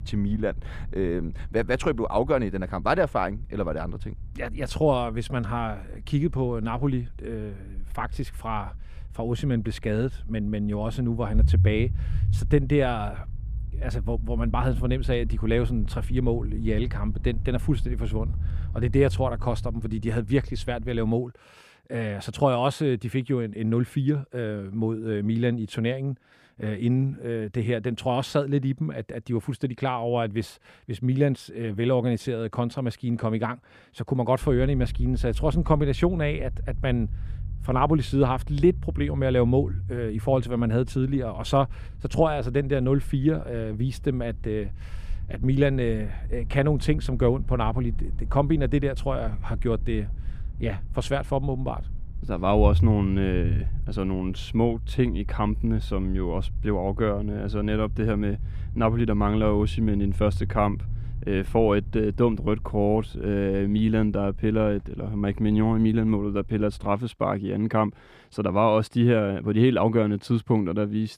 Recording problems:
low rumble; faint; until 21 s and from 34 s to 1:07; 20 dB below the speech

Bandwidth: 14.5 kHz